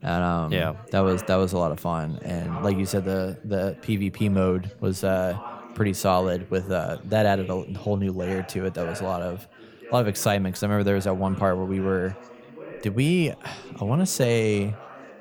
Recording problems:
background chatter; noticeable; throughout; 4 voices, 15 dB below the speech

